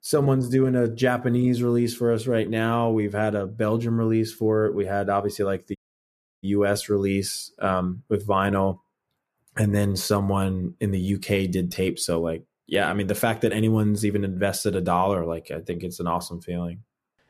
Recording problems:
audio cutting out; at 6 s for 0.5 s

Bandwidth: 14.5 kHz